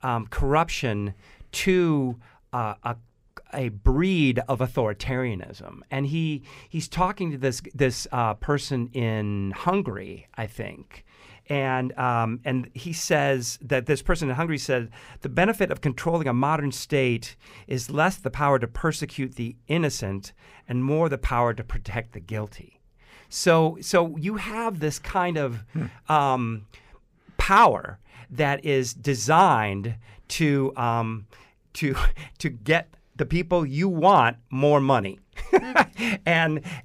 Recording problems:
none

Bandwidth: 15.5 kHz